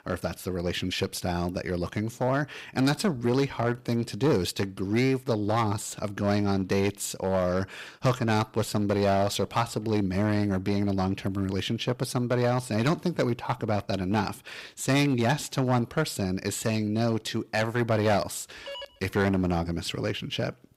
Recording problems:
distortion; slight; 4% of the sound clipped
phone ringing; faint; at 19 s; peak 10 dB below the speech

